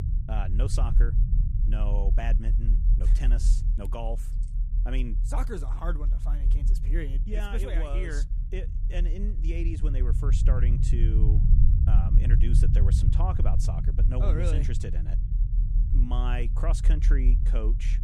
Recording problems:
low rumble; loud; throughout; 5 dB below the speech

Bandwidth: 14.5 kHz